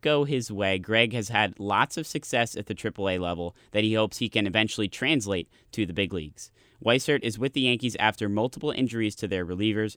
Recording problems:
none

